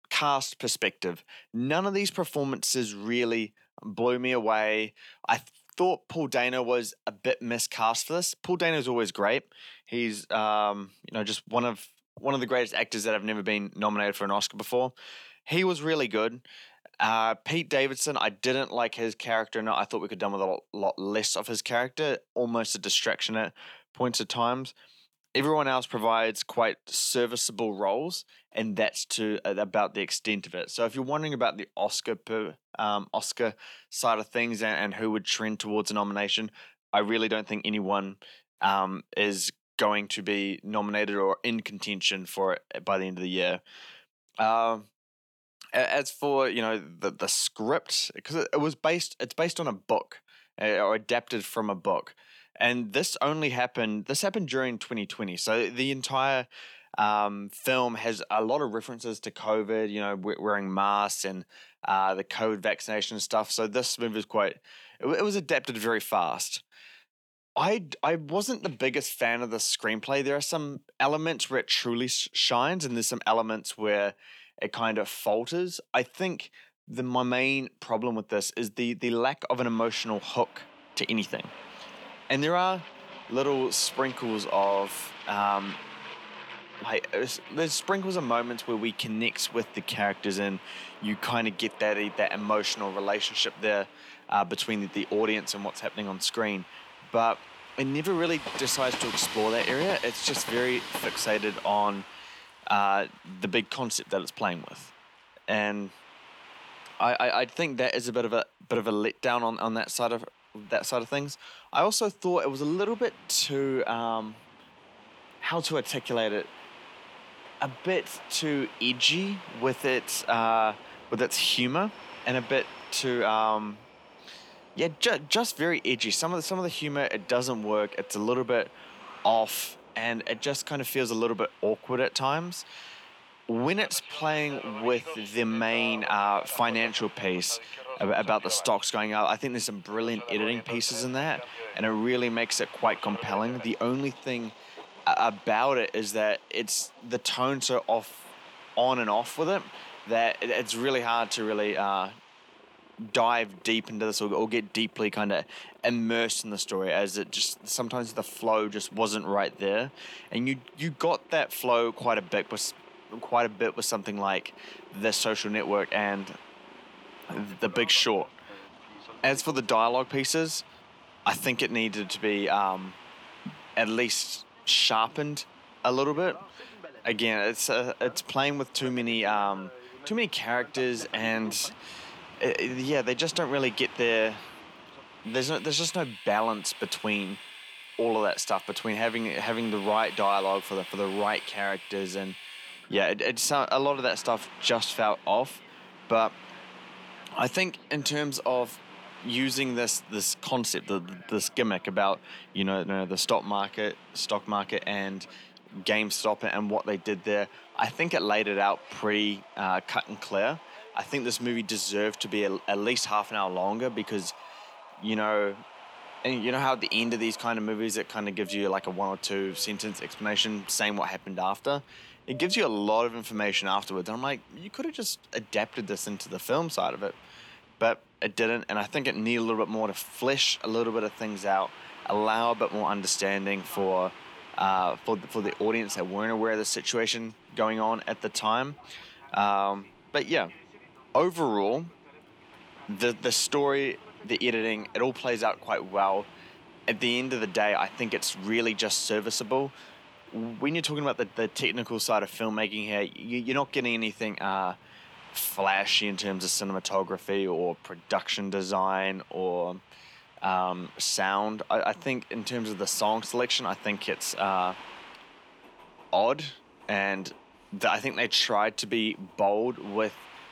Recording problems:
thin; very slightly; fading below 300 Hz
train or aircraft noise; noticeable; from 1:20 on; 15 dB below the speech

